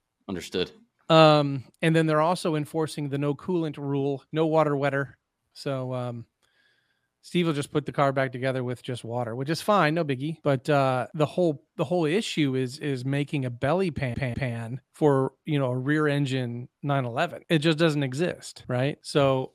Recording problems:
audio stuttering; at 14 s

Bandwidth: 15 kHz